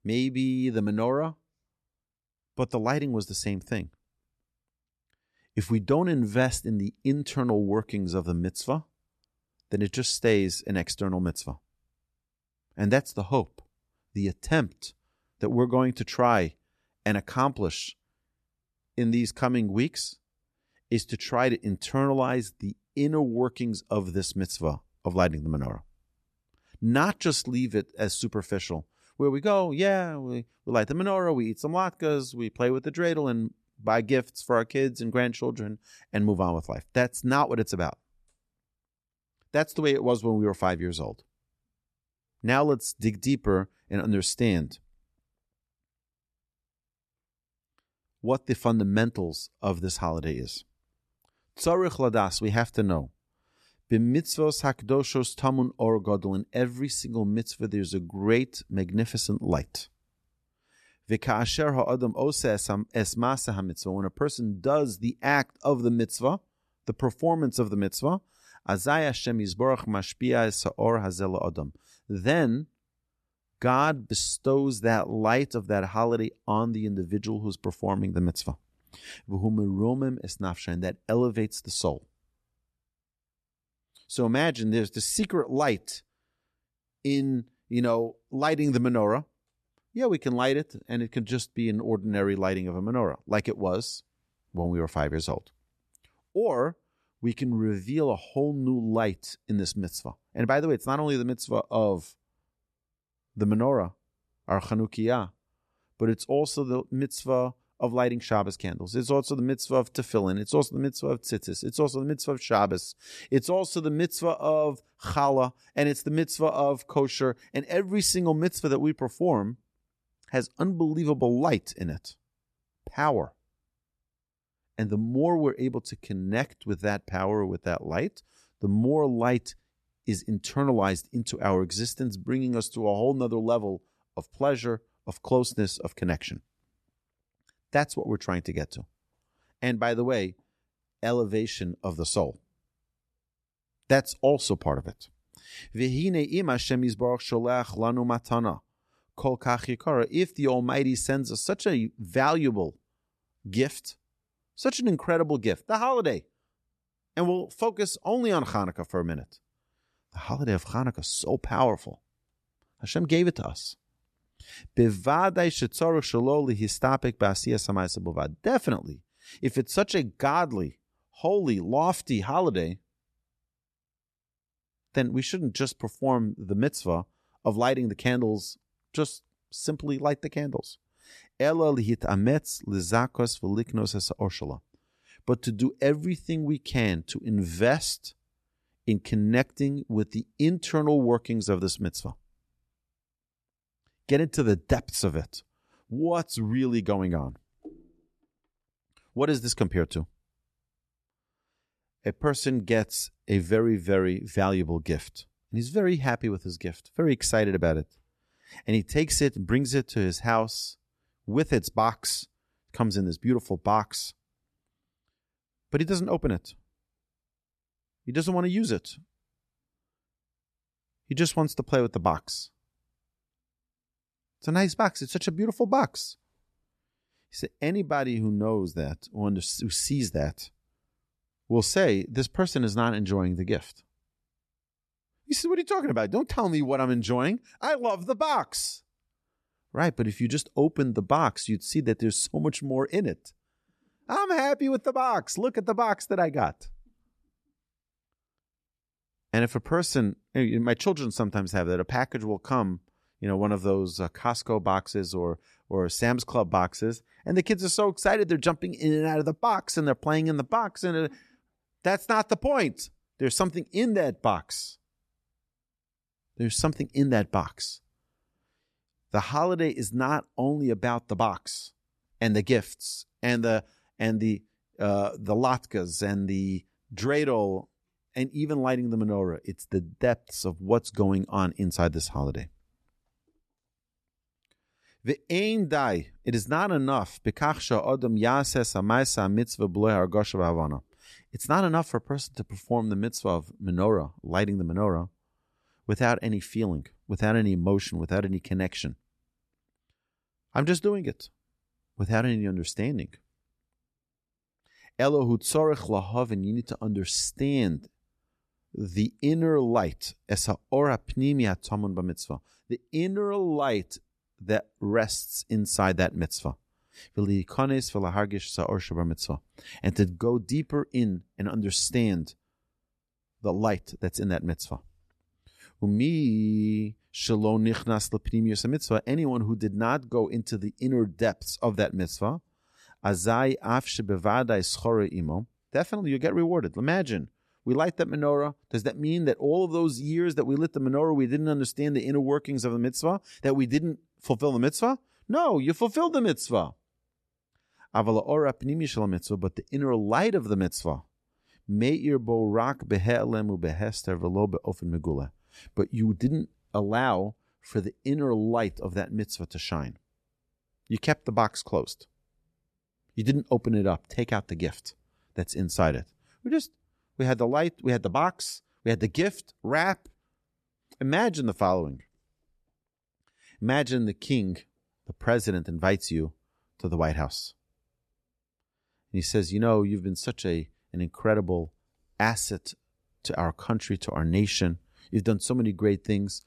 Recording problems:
none

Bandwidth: 13.5 kHz